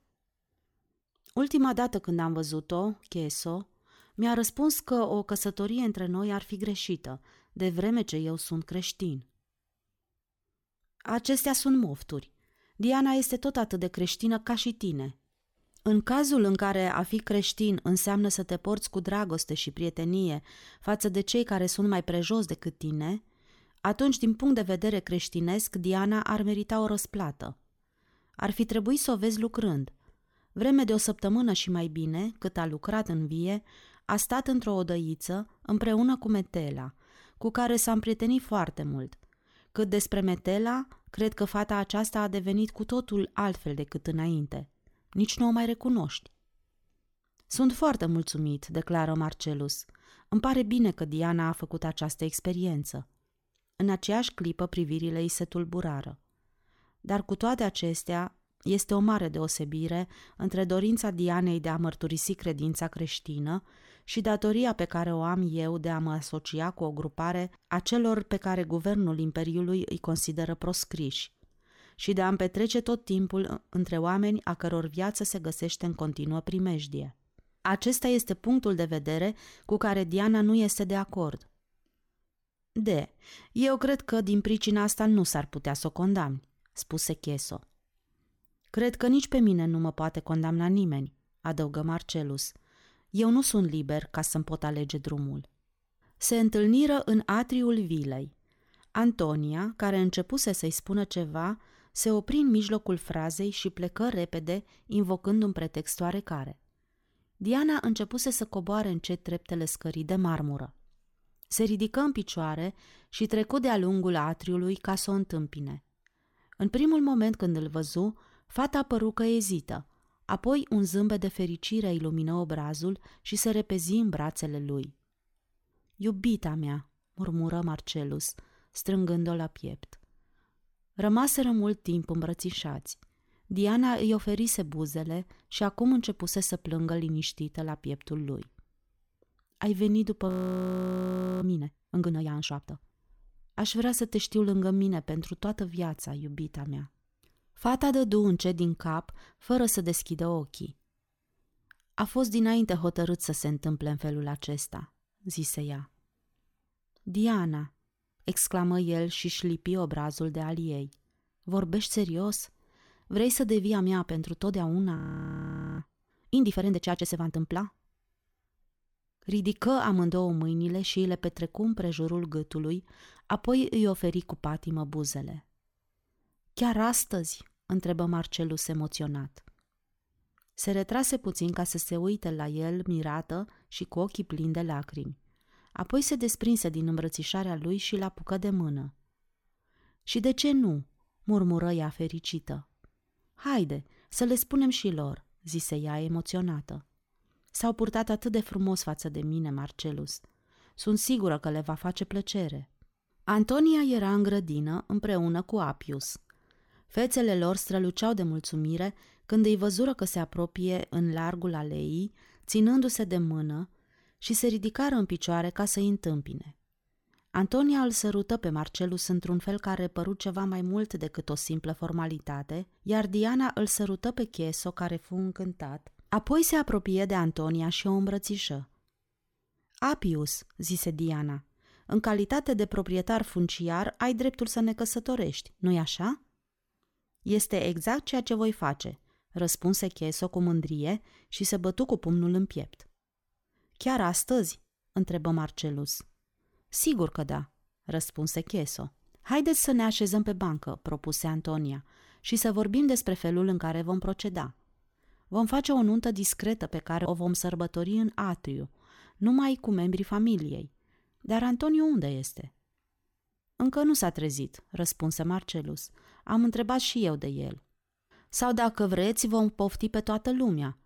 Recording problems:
audio freezing; at 2:20 for 1 s and at 2:45 for 1 s

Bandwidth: 18 kHz